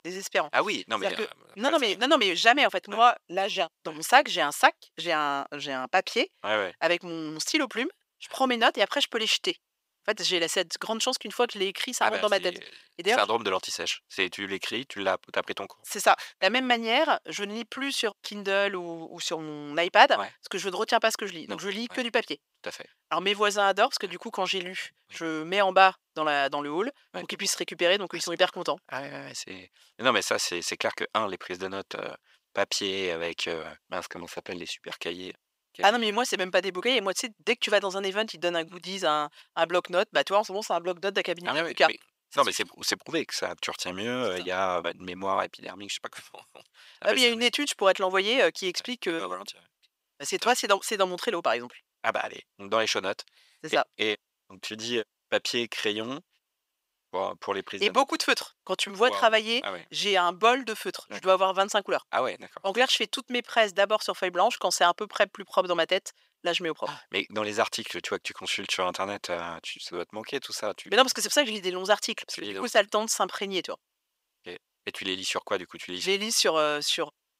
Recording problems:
thin; very; fading below 550 Hz

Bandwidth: 15.5 kHz